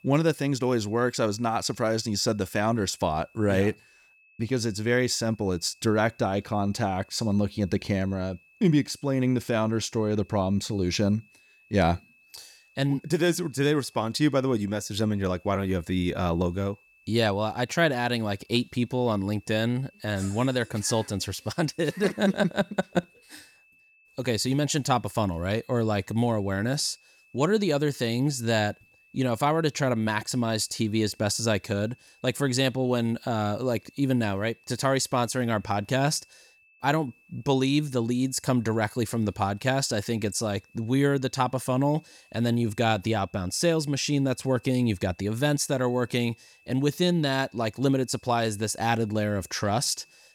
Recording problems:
high-pitched whine; faint; throughout; 2.5 kHz, 30 dB below the speech

